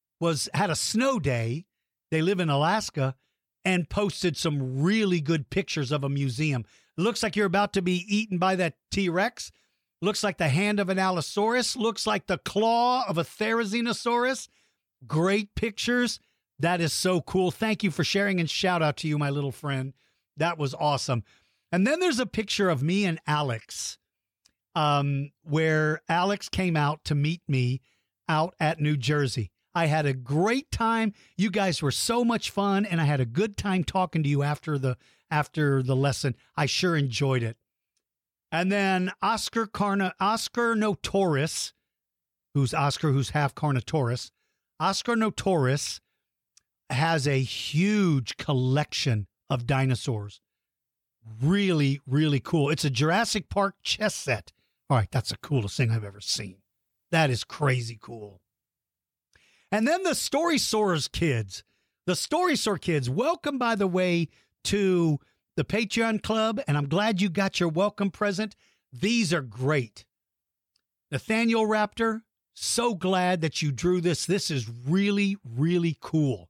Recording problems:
none

